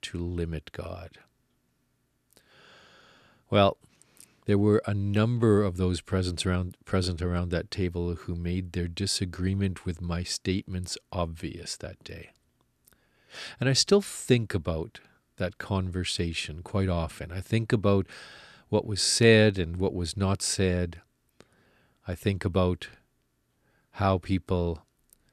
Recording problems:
none

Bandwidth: 14 kHz